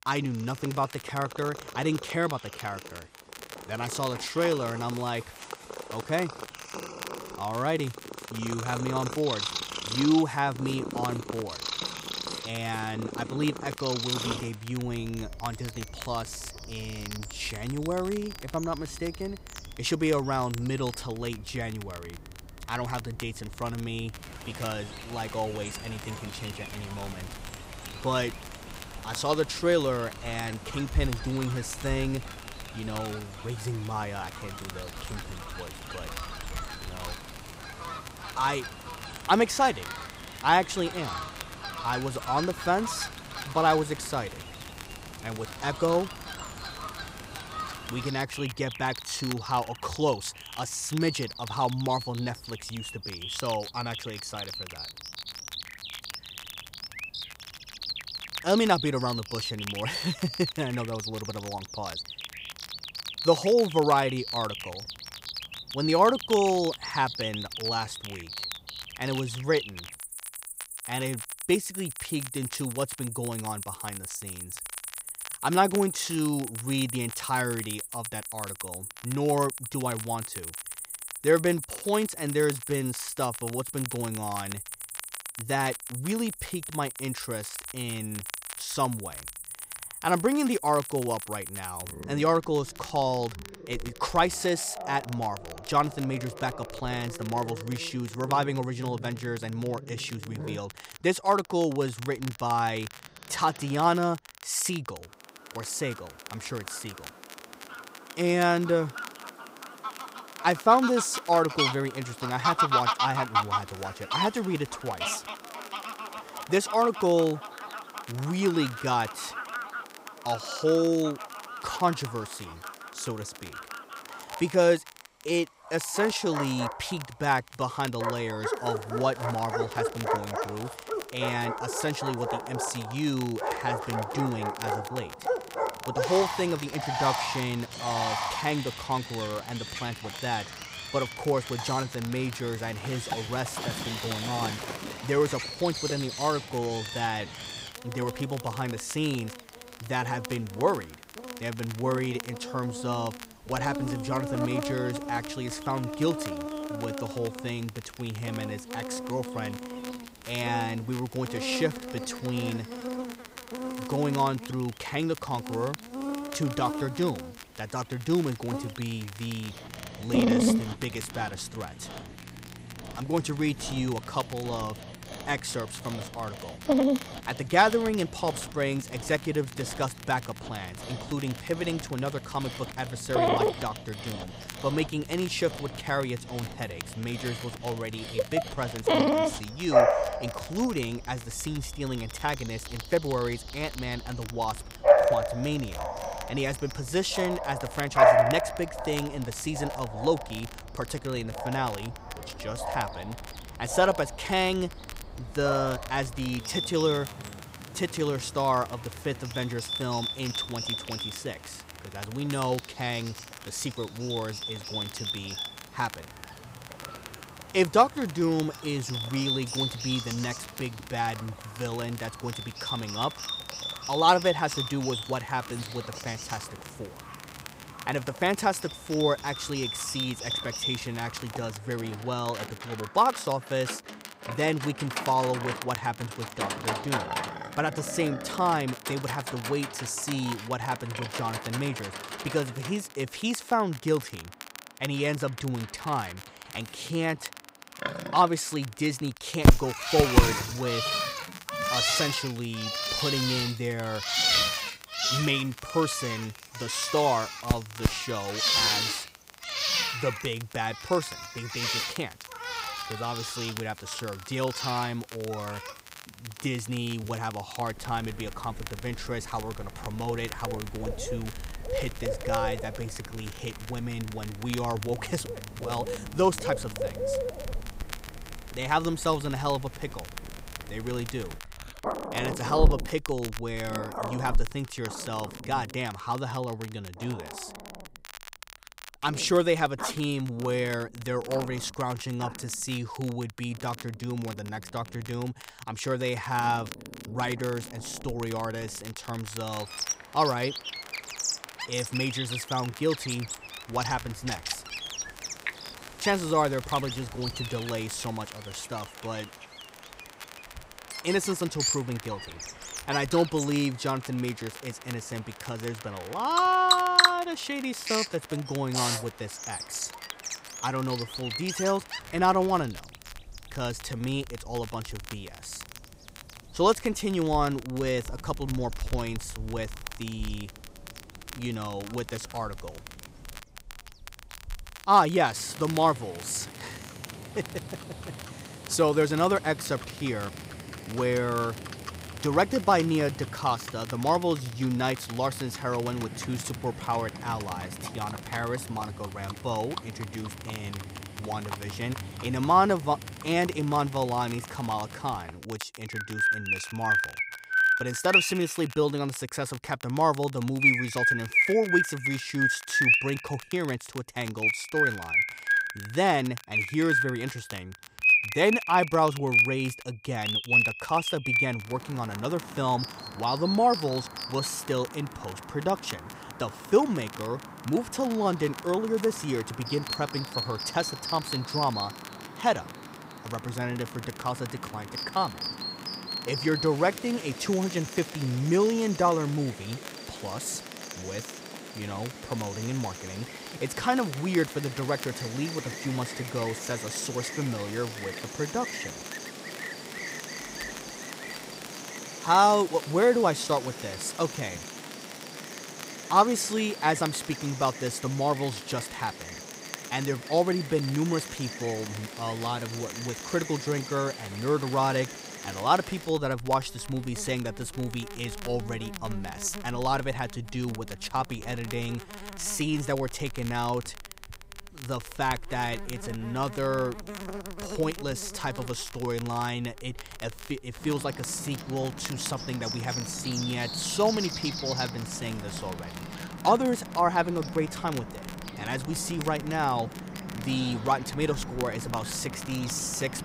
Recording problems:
animal sounds; loud; throughout; 3 dB below the speech
crackle, like an old record; noticeable; 15 dB below the speech

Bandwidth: 15.5 kHz